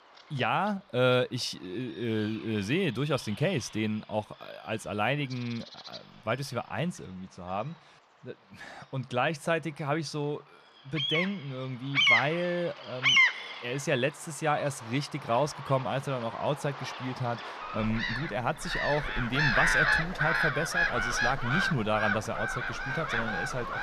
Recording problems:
animal sounds; very loud; throughout; 4 dB above the speech

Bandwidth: 14.5 kHz